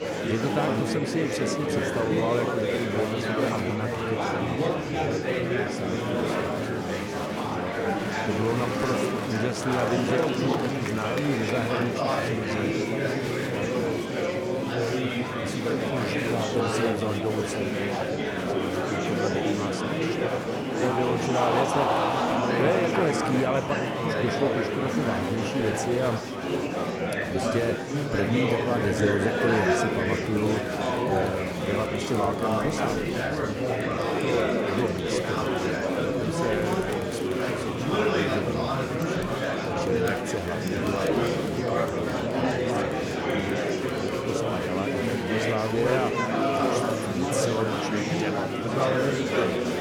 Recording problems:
murmuring crowd; very loud; throughout; 5 dB above the speech

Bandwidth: 18 kHz